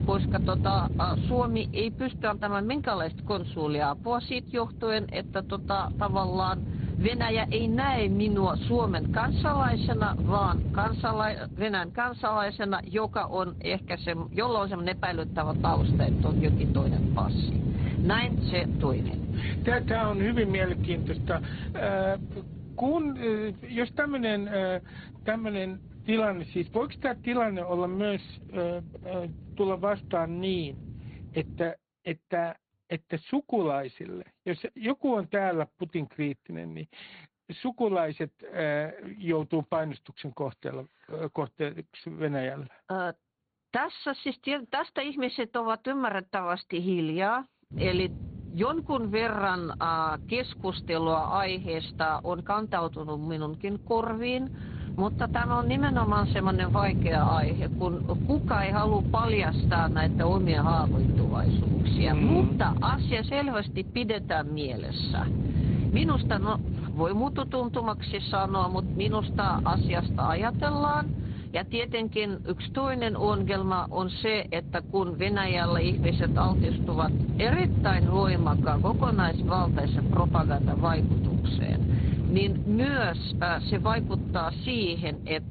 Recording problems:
high frequencies cut off; severe; nothing above 4.5 kHz
garbled, watery; slightly
wind noise on the microphone; heavy; until 32 s and from 48 s on; 9 dB below the speech

